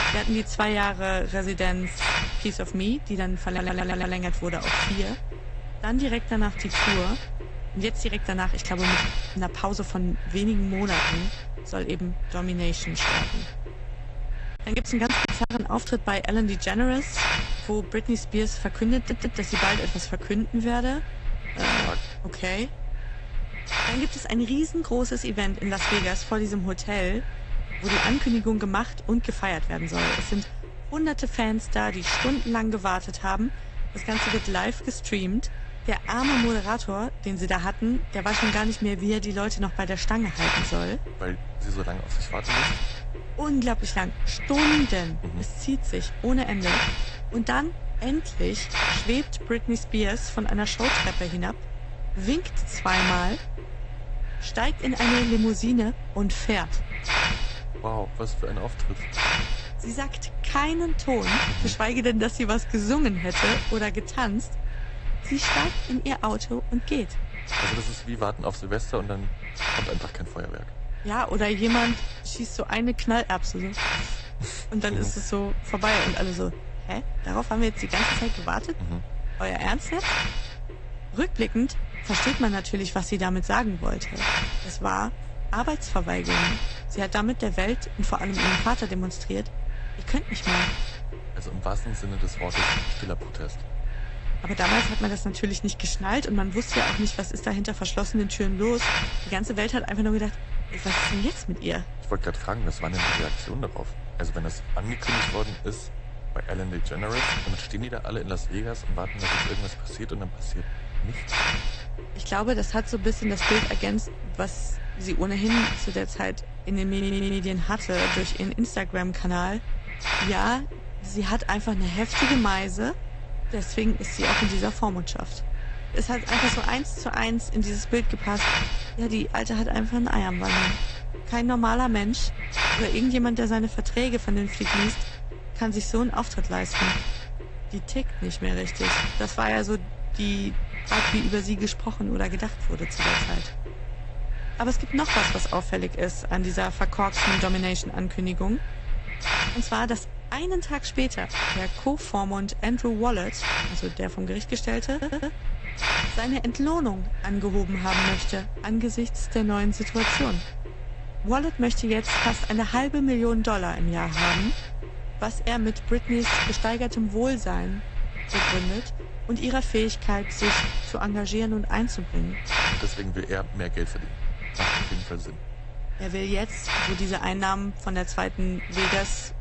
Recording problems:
garbled, watery; slightly; nothing above 8 kHz
hiss; loud; throughout; 2 dB below the speech
audio stuttering; 4 times, first at 3.5 s
choppy; very; at 15 s; 14% of the speech affected

